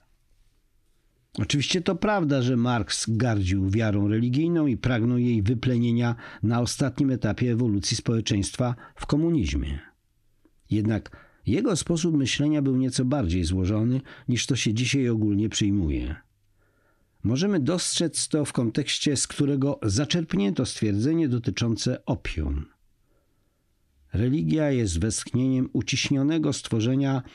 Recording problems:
squashed, flat; heavily

